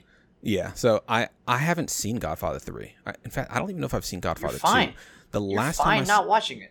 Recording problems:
none

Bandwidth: 18 kHz